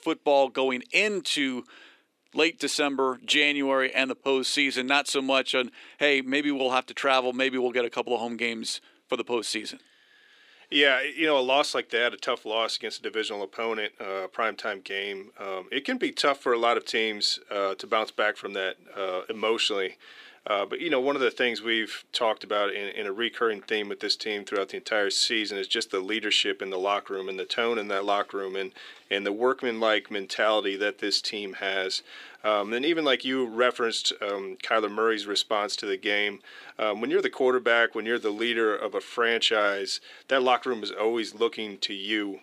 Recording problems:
thin; somewhat; fading below 350 Hz

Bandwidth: 15 kHz